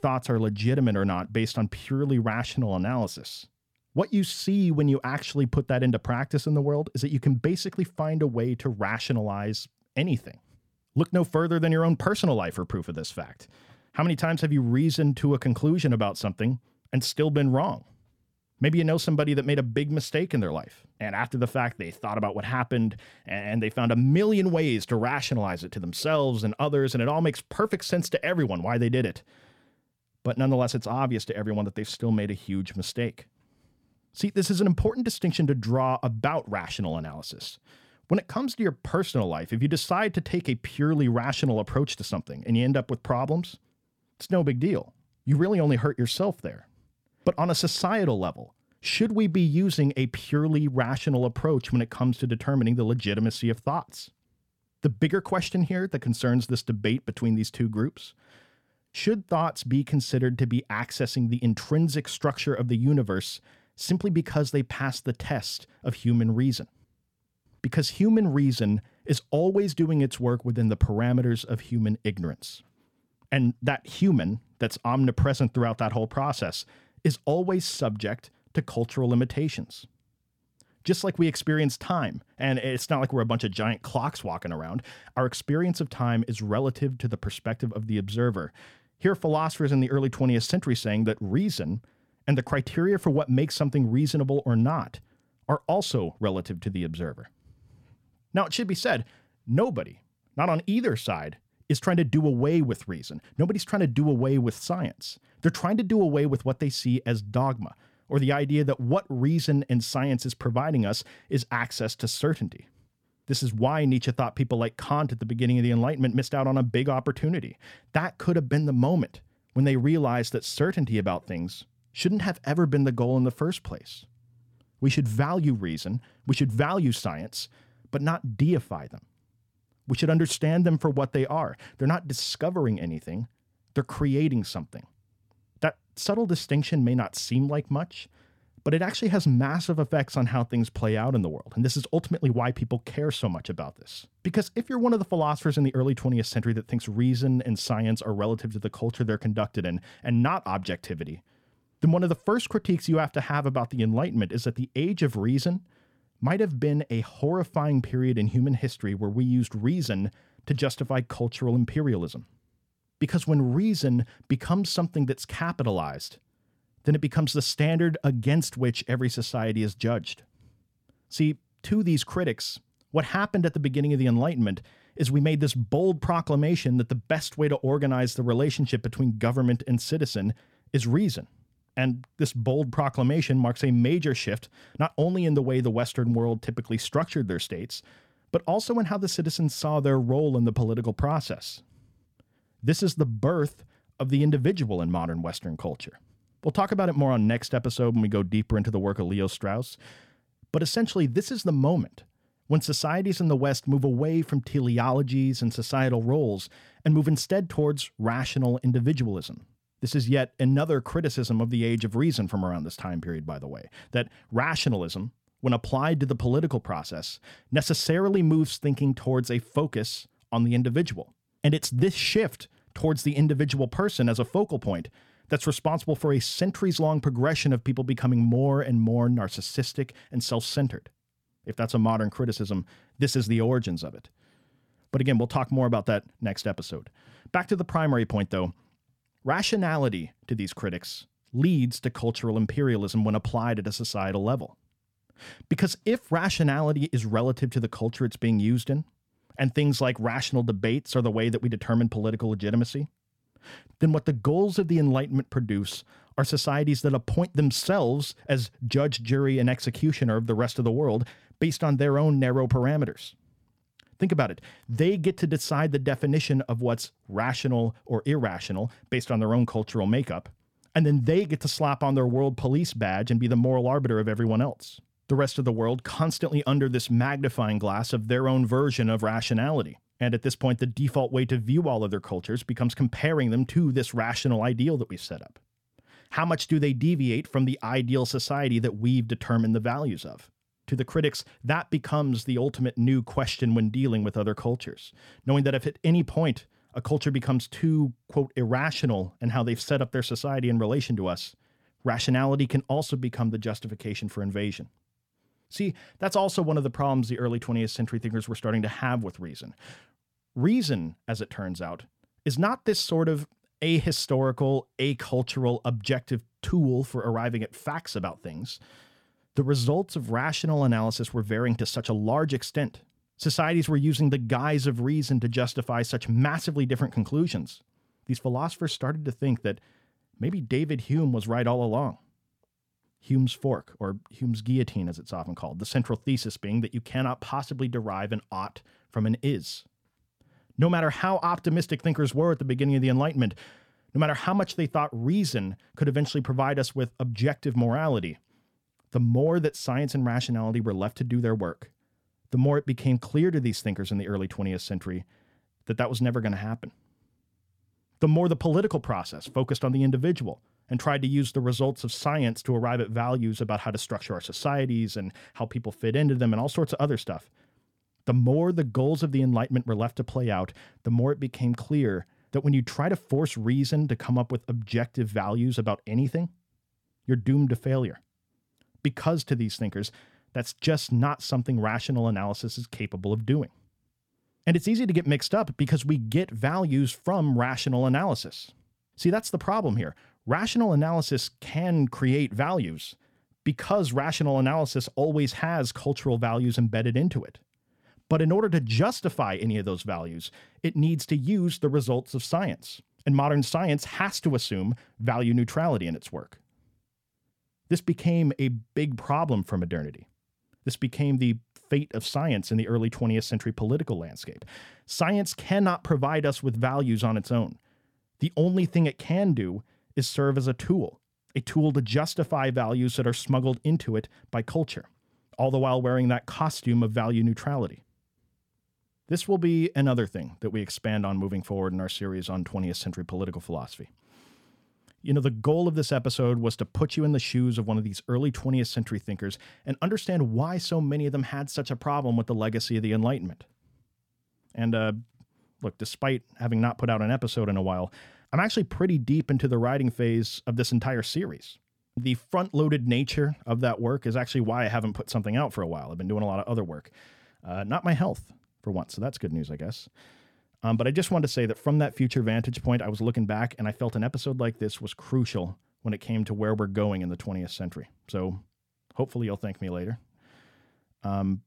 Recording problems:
none

